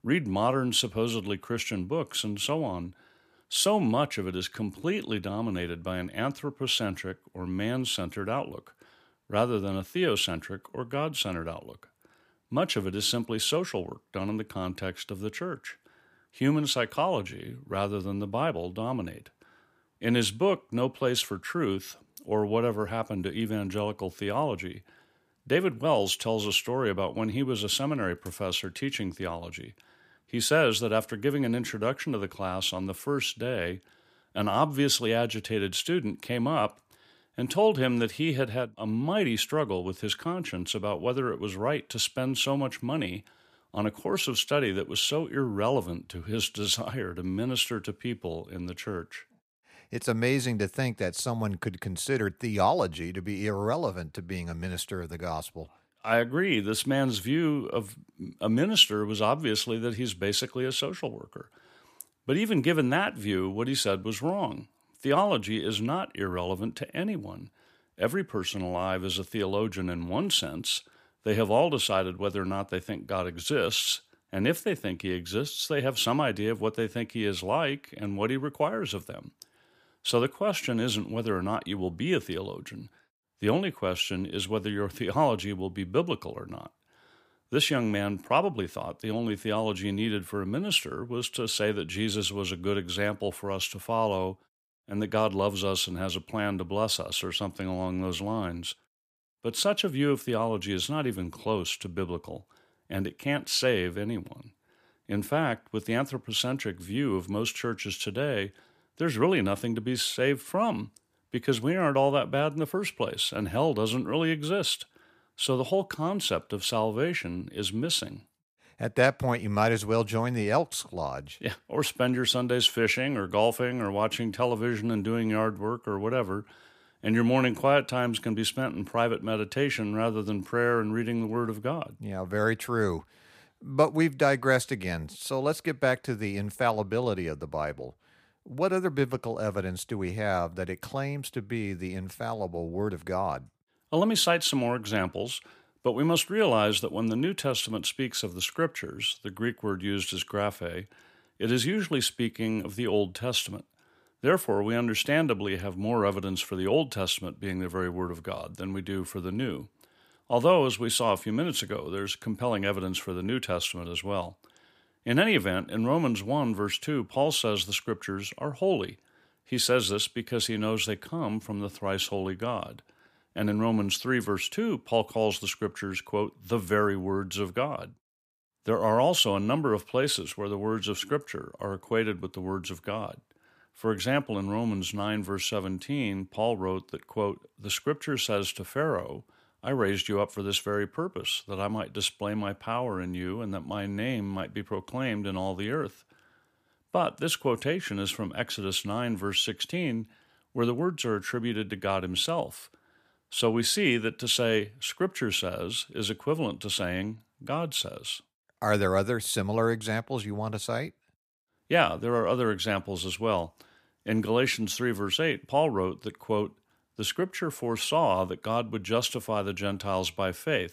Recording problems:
none

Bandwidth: 15 kHz